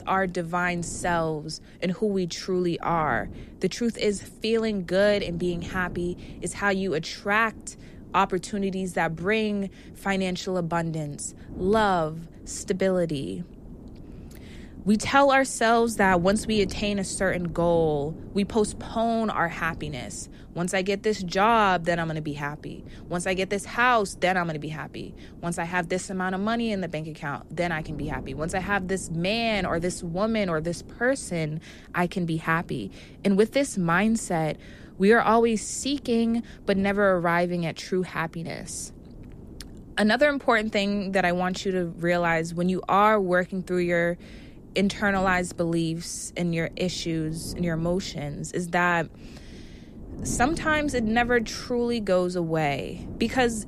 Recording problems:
wind noise on the microphone; occasional gusts; 25 dB below the speech

